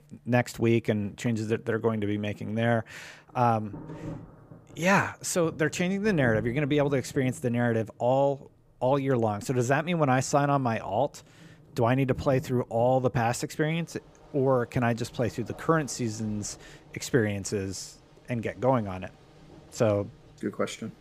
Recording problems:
rain or running water; faint; throughout; 20 dB below the speech

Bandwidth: 15 kHz